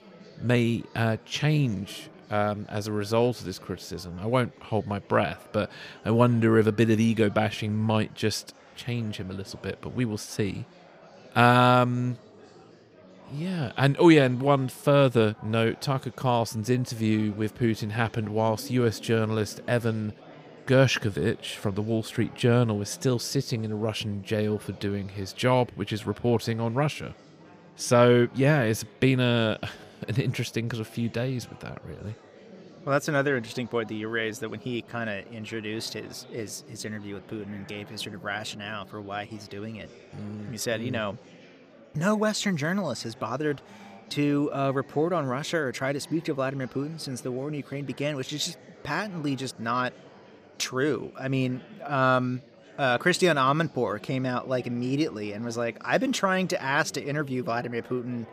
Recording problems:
chatter from many people; faint; throughout; 25 dB below the speech

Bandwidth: 15 kHz